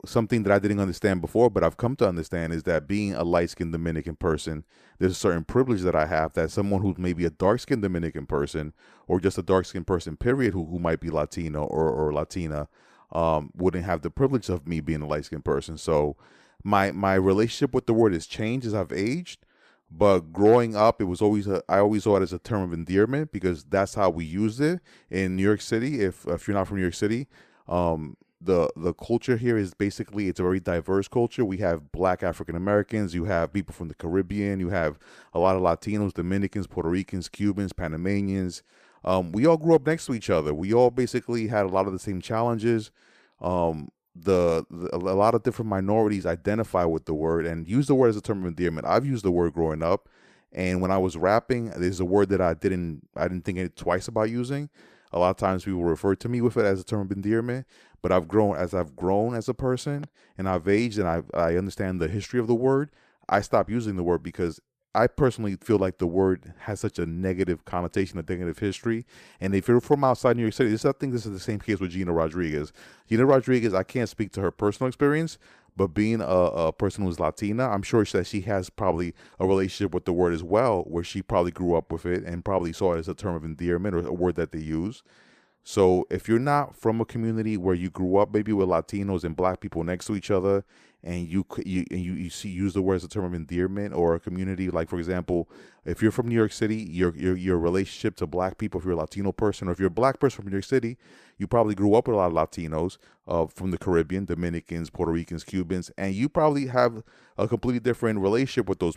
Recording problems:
none

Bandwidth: 15 kHz